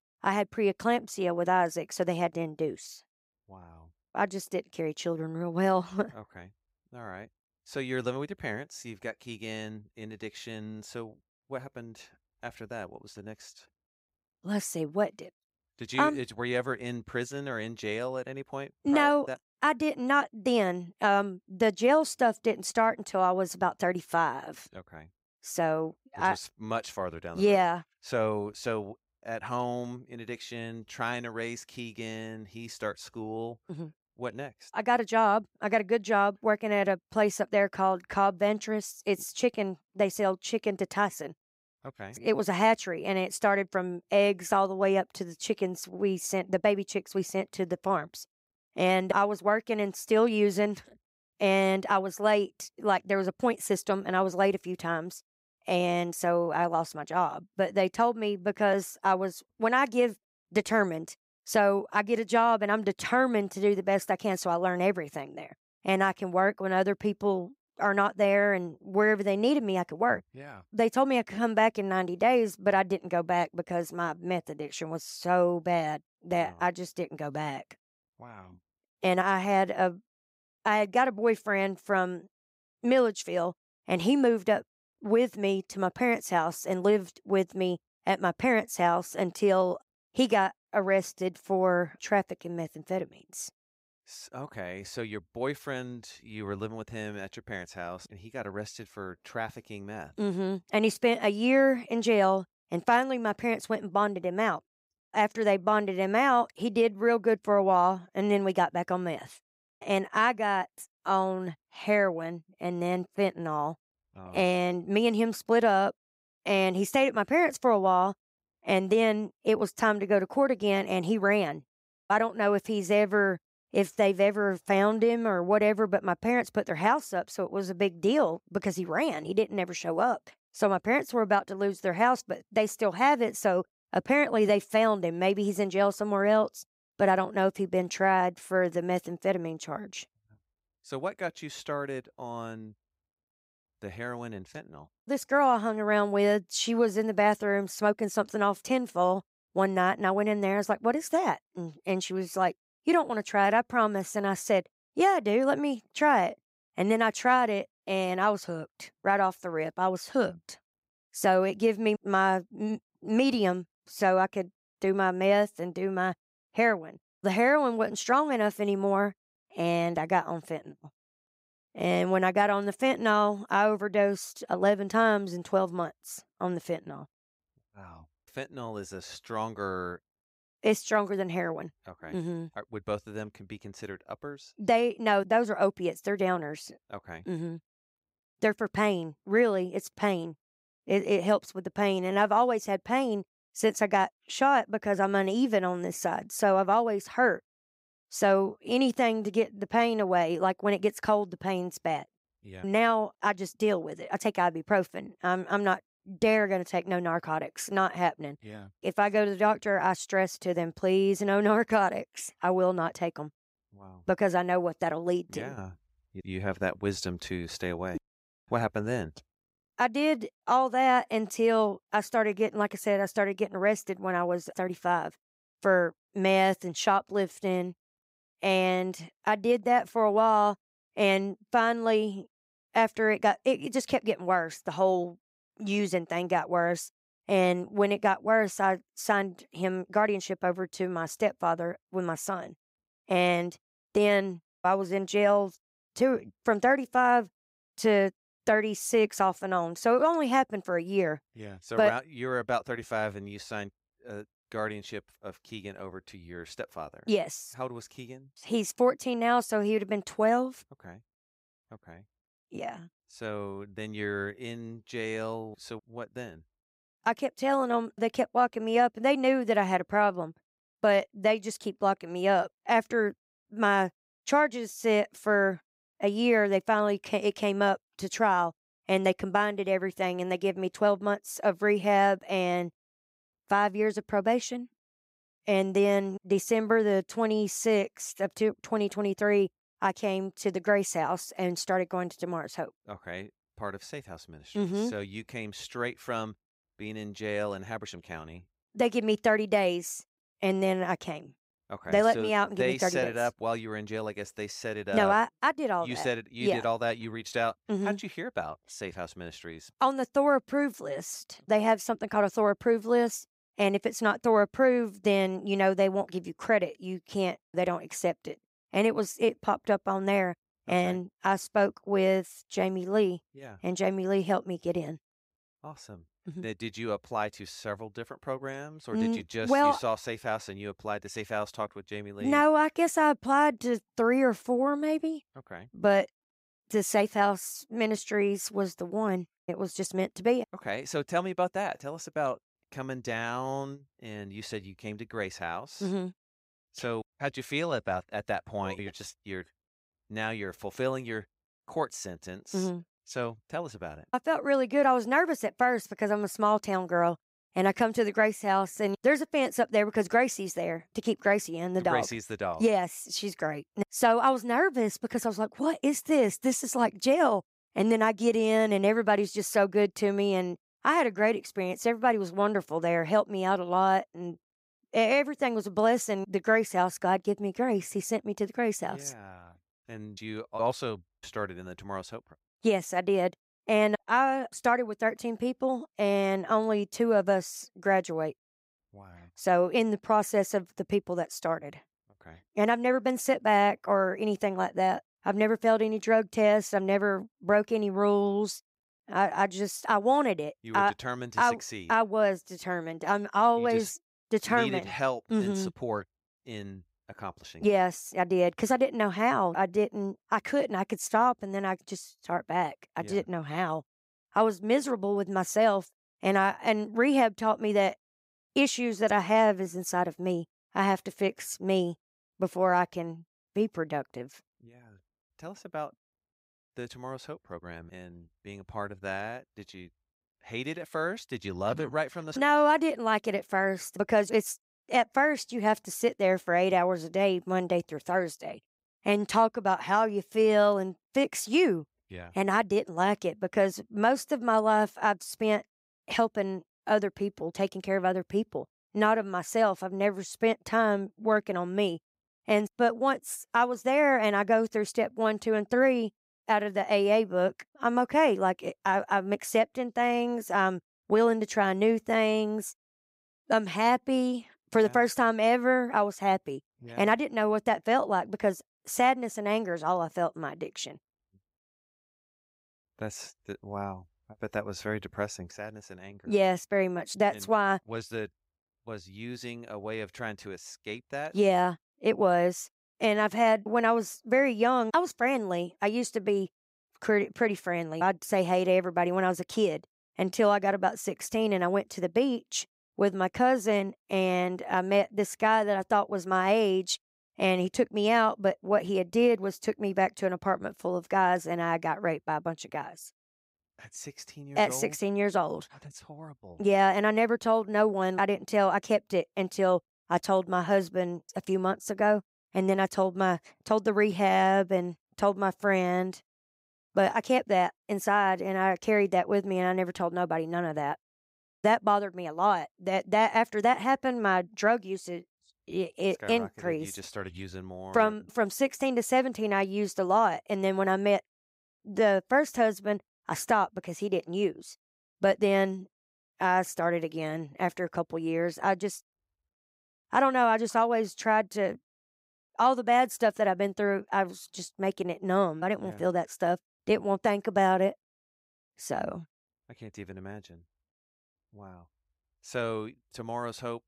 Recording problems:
none

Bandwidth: 15.5 kHz